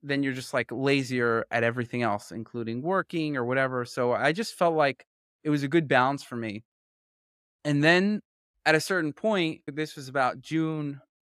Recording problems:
none

